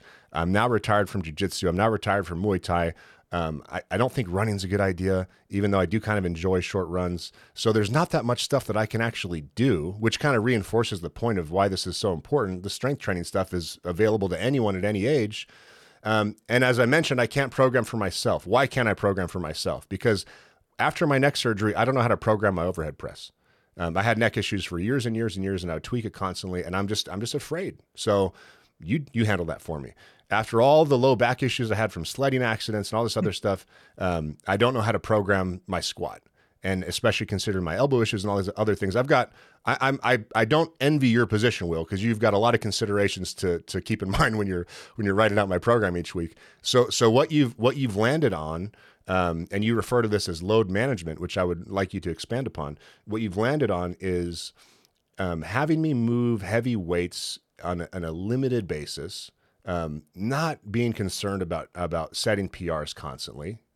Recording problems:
none

